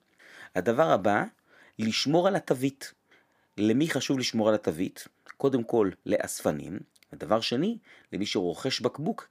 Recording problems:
none

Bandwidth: 15 kHz